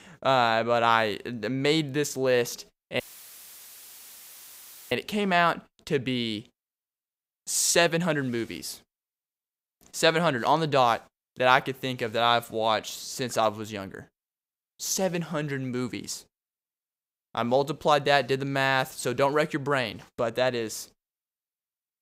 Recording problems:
audio cutting out; filled with static; at 3 s for 2 s

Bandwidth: 15.5 kHz